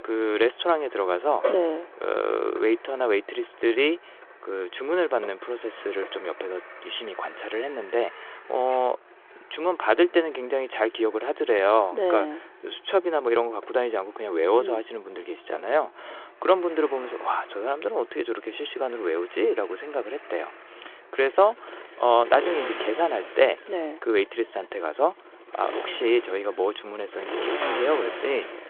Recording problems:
phone-call audio; nothing above 3.5 kHz
traffic noise; noticeable; throughout; 10 dB below the speech

